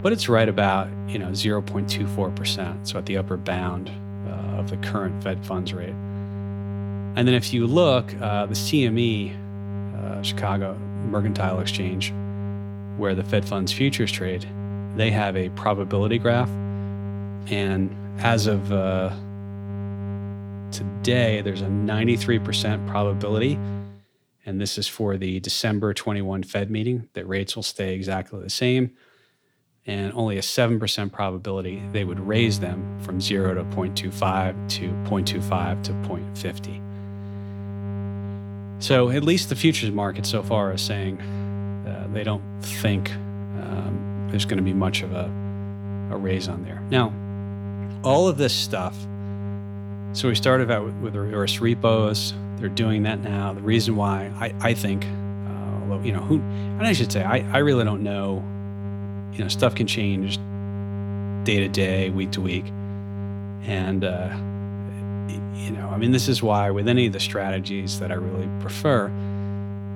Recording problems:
electrical hum; noticeable; until 24 s and from 32 s on; 50 Hz, 15 dB below the speech

